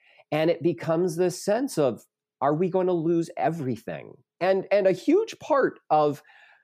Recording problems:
none

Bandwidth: 15 kHz